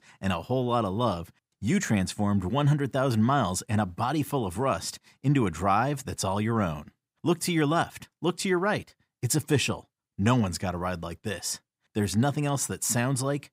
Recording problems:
none

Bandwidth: 15.5 kHz